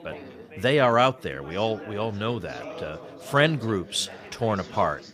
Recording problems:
background chatter; noticeable; throughout; 4 voices, 15 dB below the speech

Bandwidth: 15 kHz